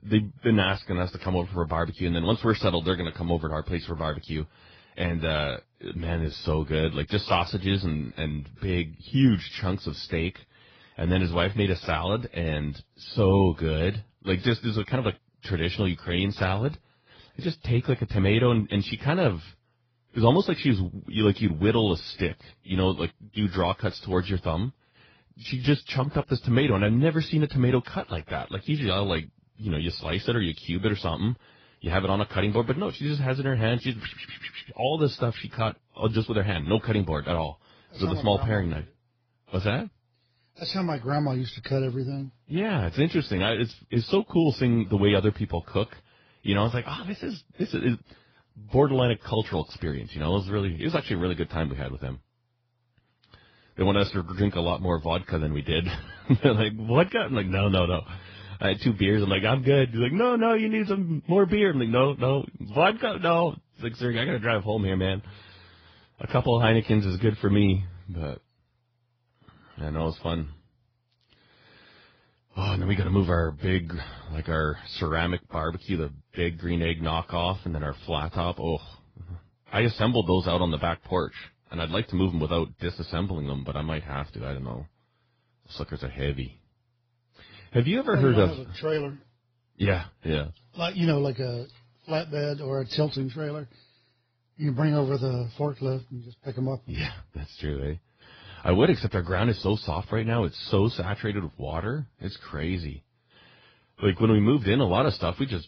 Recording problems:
garbled, watery; badly
high frequencies cut off; noticeable; nothing above 5 kHz

